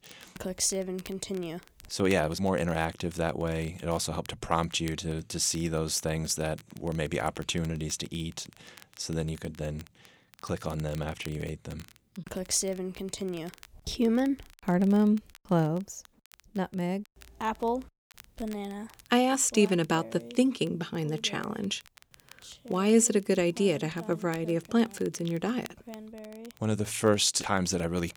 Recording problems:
crackle, like an old record; faint; 25 dB below the speech

